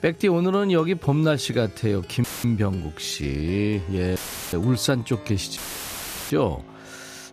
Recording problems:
background music; noticeable; throughout; 20 dB below the speech
audio cutting out; filled with static; at 2 s, at 4 s and at 5.5 s for 0.5 s

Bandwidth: 14.5 kHz